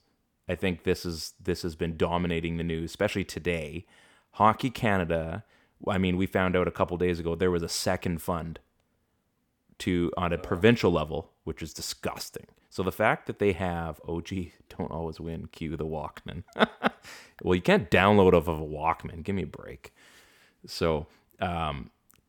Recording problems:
none

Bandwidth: 18.5 kHz